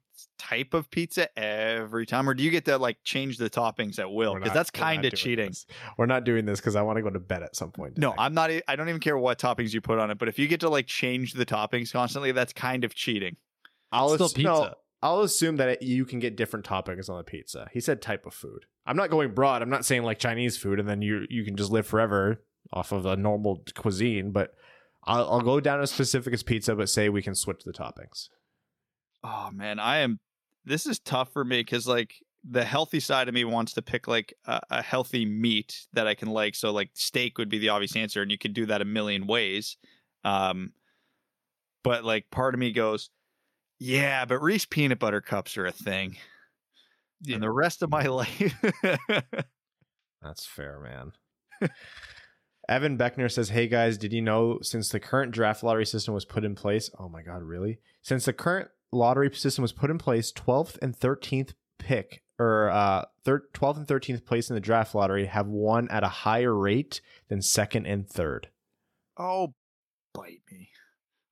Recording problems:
none

